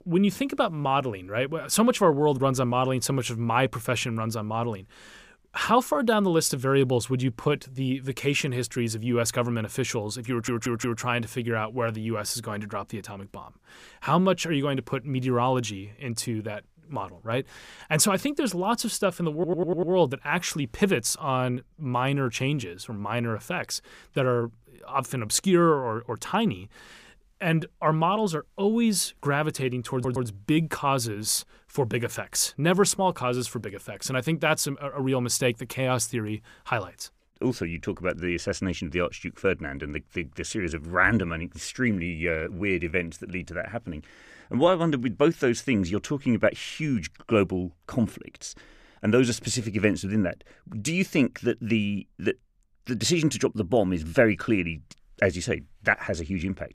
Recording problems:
audio stuttering; at 10 s, at 19 s and at 30 s

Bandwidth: 15 kHz